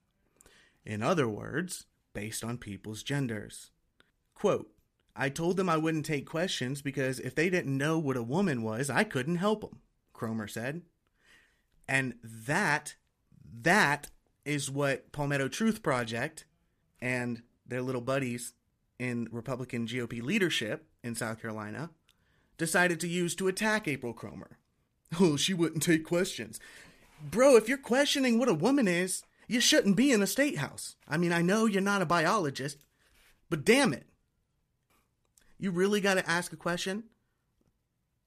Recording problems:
none

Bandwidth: 14.5 kHz